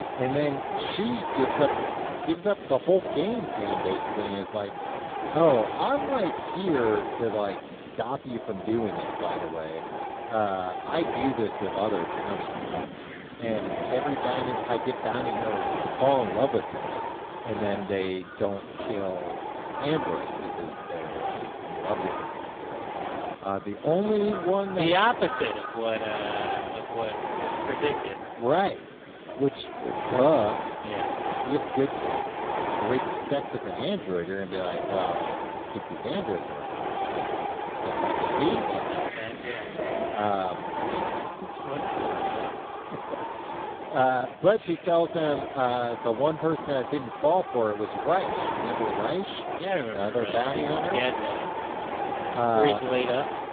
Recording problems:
phone-call audio; poor line; nothing above 3.5 kHz
wind noise on the microphone; heavy; 3 dB below the speech
animal sounds; noticeable; from 12 s on; 15 dB below the speech
murmuring crowd; faint; throughout; 25 dB below the speech

